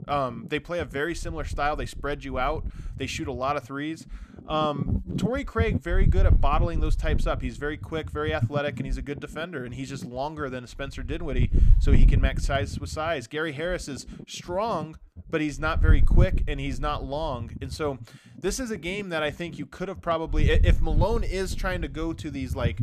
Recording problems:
wind noise on the microphone; occasional gusts; 15 dB below the speech

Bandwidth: 14.5 kHz